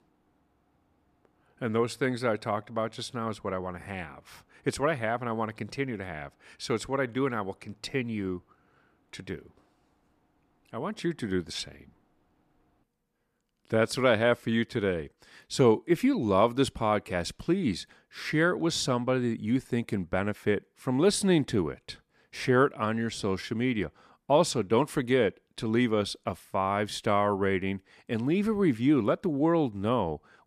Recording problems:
none

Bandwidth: 14.5 kHz